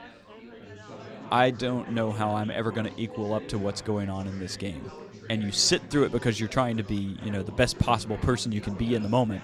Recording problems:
chatter from many people; noticeable; throughout; 15 dB below the speech

